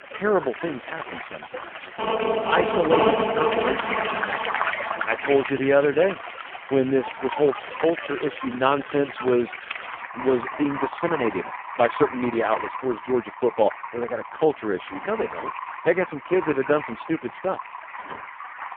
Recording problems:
phone-call audio; poor line; nothing above 3 kHz
rain or running water; loud; throughout; 9 dB below the speech
phone ringing; loud; from 2 to 5.5 s; peak 4 dB above the speech
door banging; faint; at 18 s; peak 15 dB below the speech

